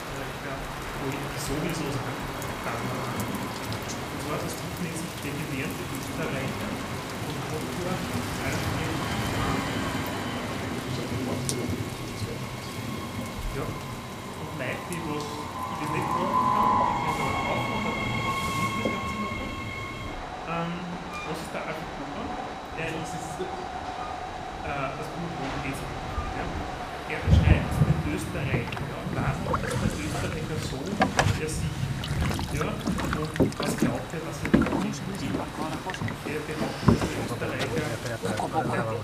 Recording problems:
room echo; slight; dies away in 0.6 s
off-mic speech; somewhat distant
rain or running water; very loud; throughout; as loud as the speech
train or aircraft noise; very loud; throughout; 4 dB above the speech
high-pitched whine; noticeable; throughout; 4 kHz, 20 dB below the speech

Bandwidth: 15 kHz